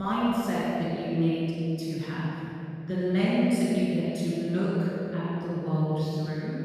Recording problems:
room echo; strong; dies away in 3 s
off-mic speech; far
abrupt cut into speech; at the start

